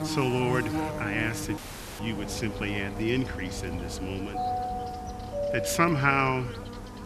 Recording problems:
electrical hum; loud; throughout; 50 Hz, 10 dB below the speech
audio cutting out; at 1.5 s
doorbell; noticeable; from 4.5 to 6.5 s; peak 2 dB below the speech

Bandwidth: 13.5 kHz